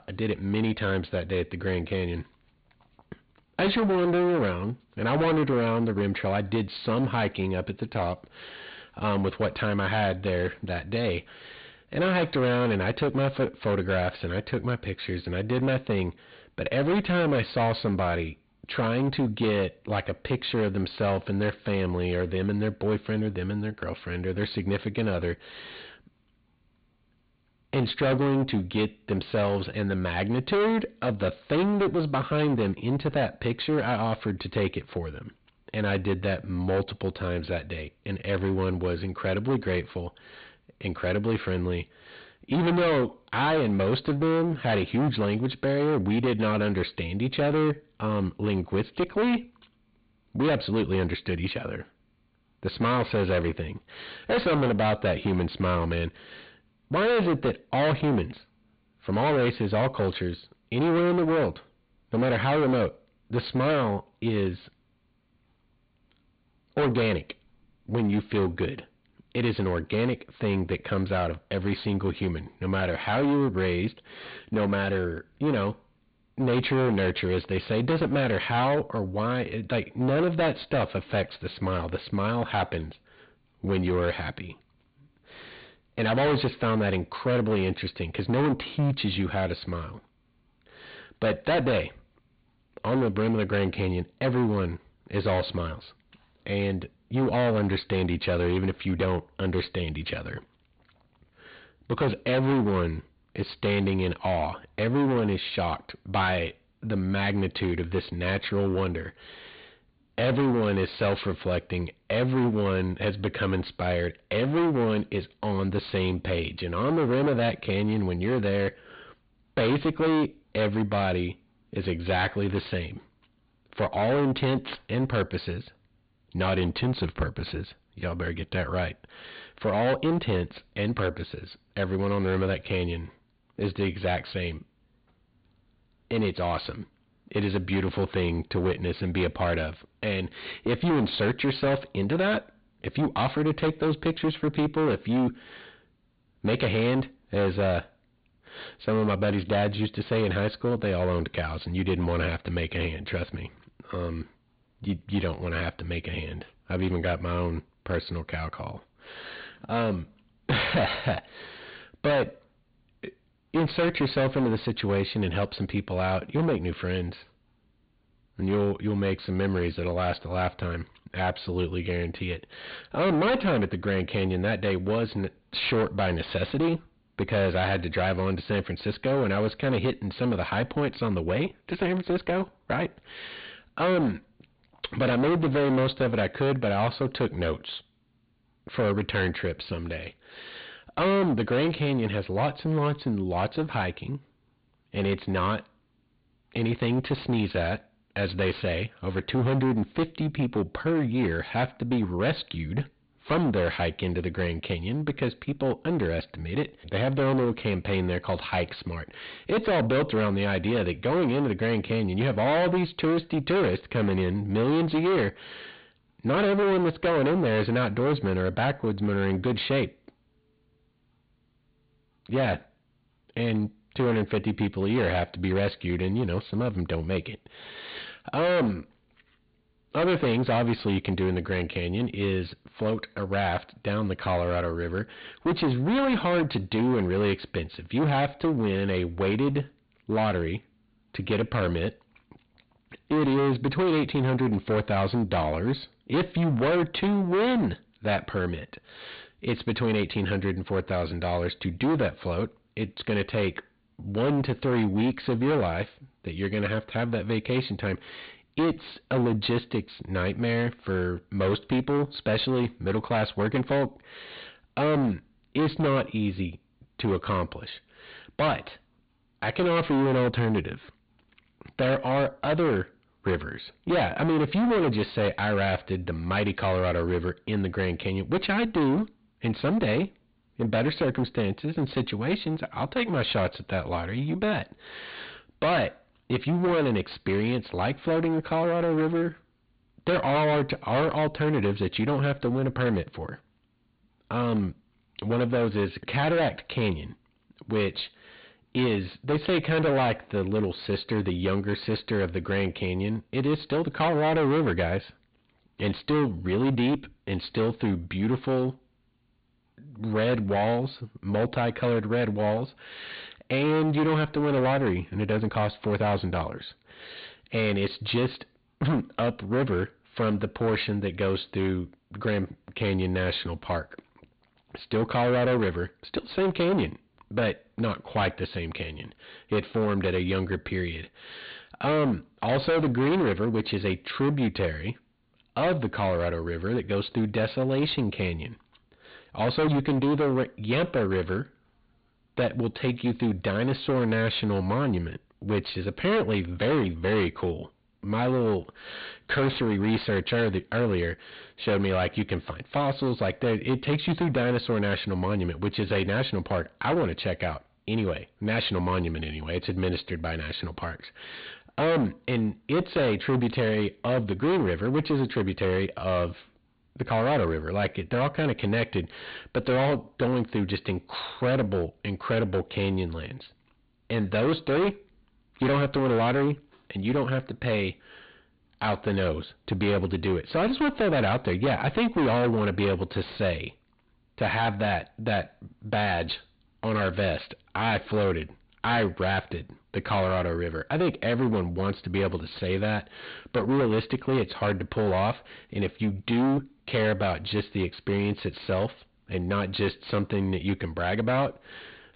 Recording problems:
distortion; heavy; 16% of the sound clipped
high frequencies cut off; severe; nothing above 4.5 kHz

